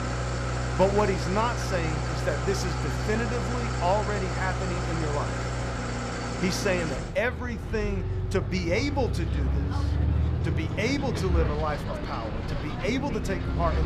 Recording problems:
traffic noise; very loud; throughout; as loud as the speech
chatter from many people; faint; throughout; 20 dB below the speech
abrupt cut into speech; at the end

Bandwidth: 14.5 kHz